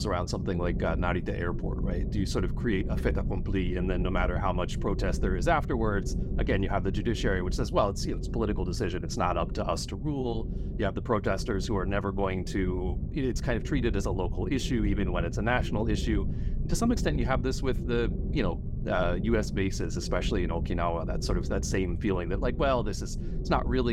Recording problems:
low rumble; noticeable; throughout; 15 dB below the speech
abrupt cut into speech; at the start and the end

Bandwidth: 16.5 kHz